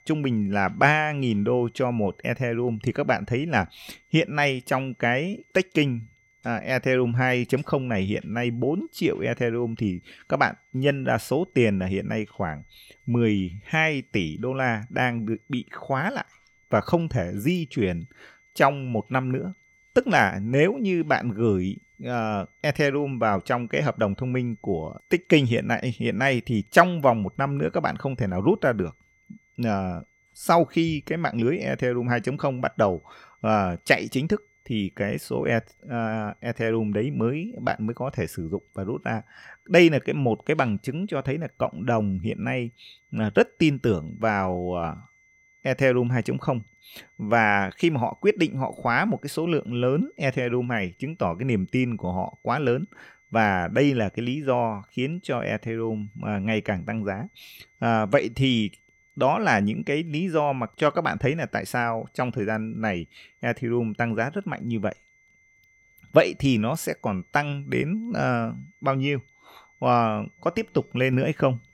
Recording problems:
high-pitched whine; faint; throughout; 2 kHz, 35 dB below the speech

